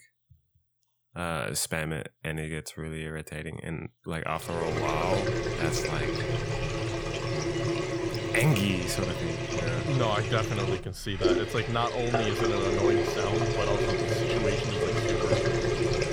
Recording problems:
household noises; very loud; from 4.5 s on; 3 dB above the speech

